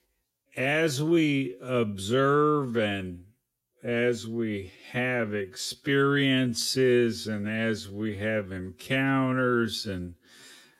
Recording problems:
wrong speed, natural pitch; too slow; 0.6 times normal speed

